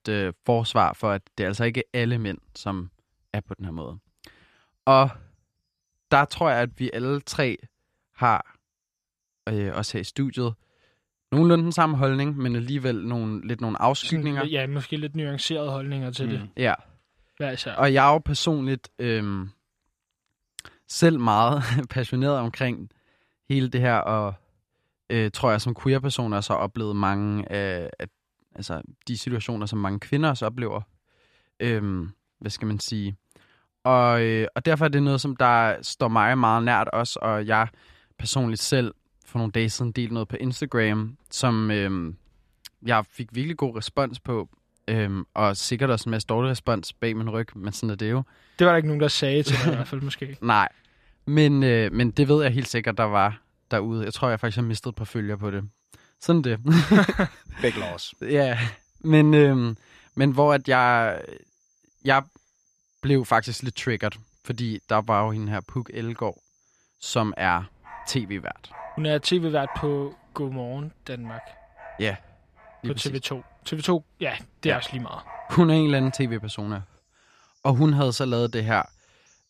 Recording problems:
animal sounds; faint; throughout; 25 dB below the speech

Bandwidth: 14.5 kHz